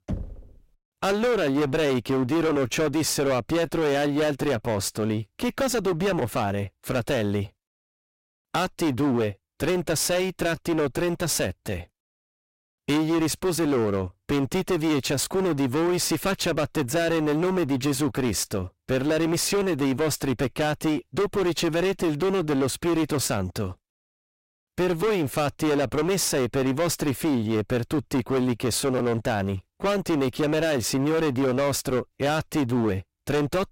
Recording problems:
distortion; heavy; 22% of the sound clipped
door banging; noticeable; at the start; peak 9 dB below the speech

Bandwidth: 16 kHz